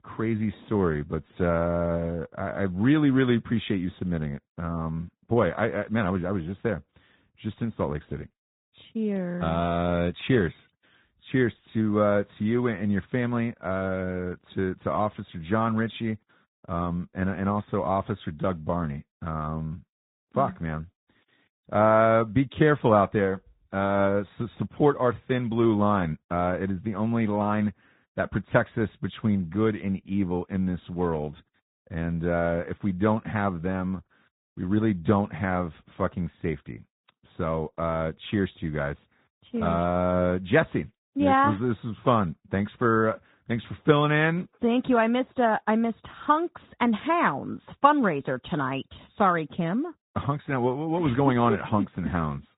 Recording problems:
high frequencies cut off; severe; nothing above 4 kHz
garbled, watery; slightly

